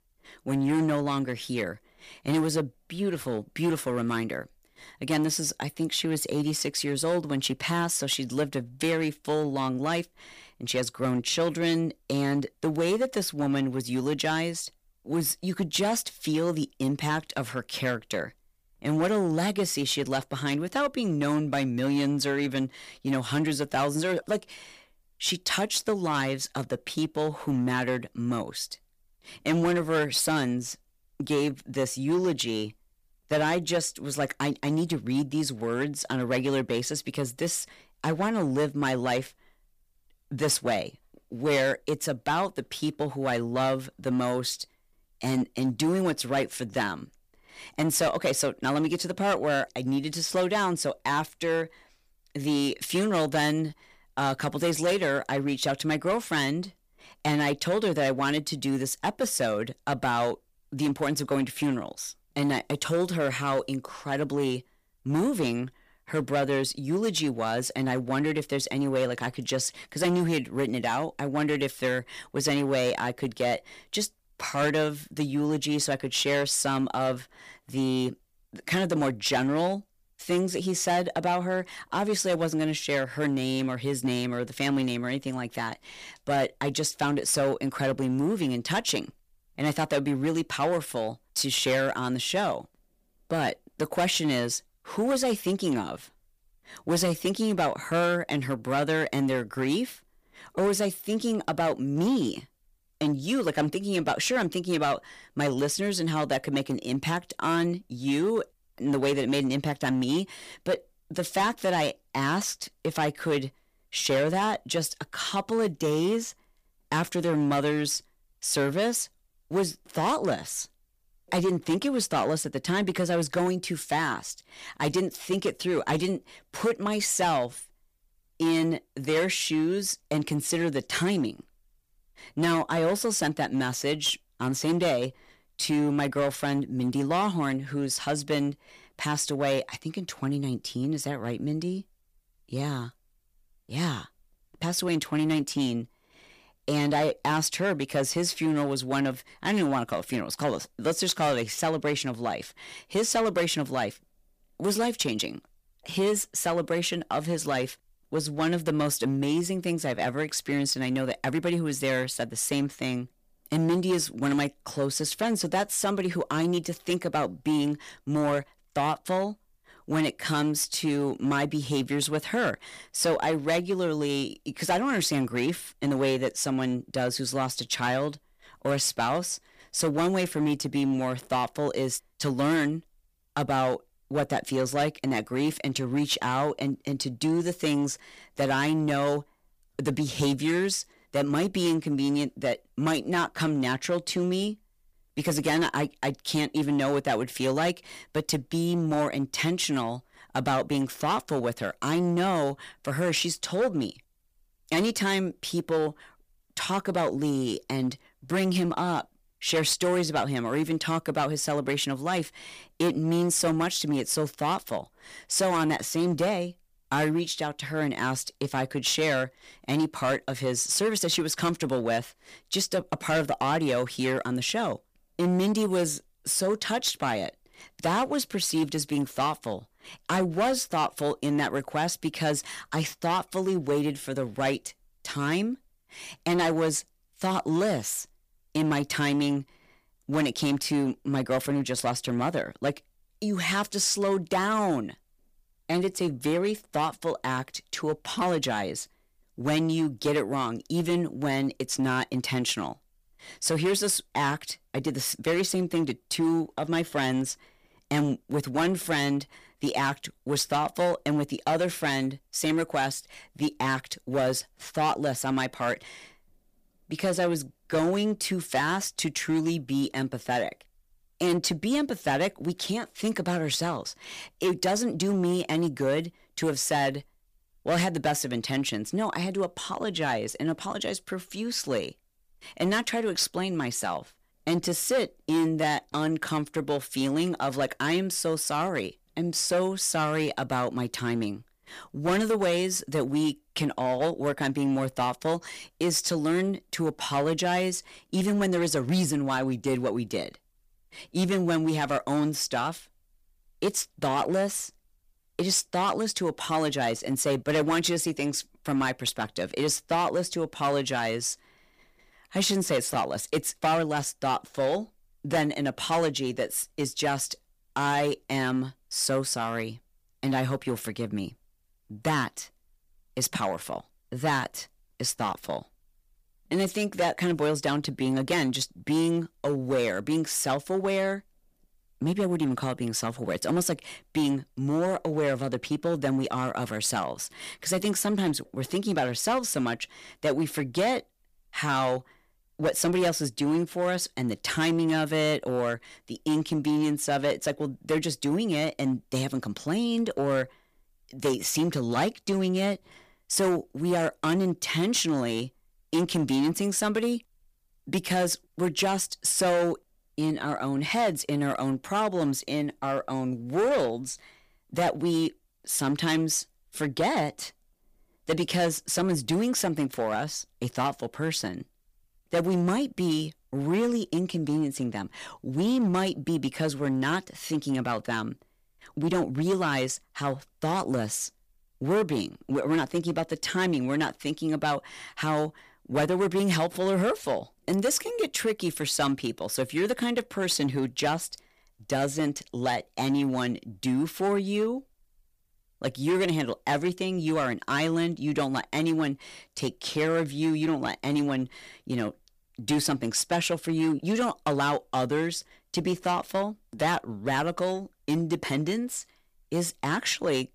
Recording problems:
distortion; slight; 7% of the sound clipped

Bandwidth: 15 kHz